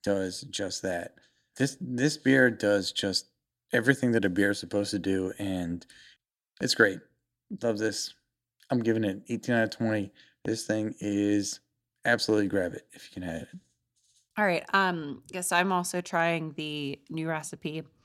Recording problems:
none

